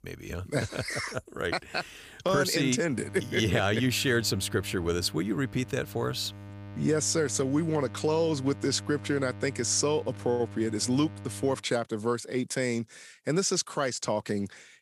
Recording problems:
electrical hum; faint; from 3 to 12 s; 50 Hz, 20 dB below the speech

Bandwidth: 15 kHz